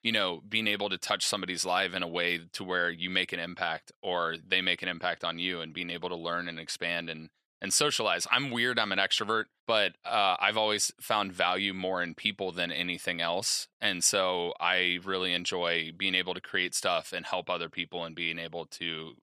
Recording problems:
thin; somewhat; fading below 1 kHz

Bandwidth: 14.5 kHz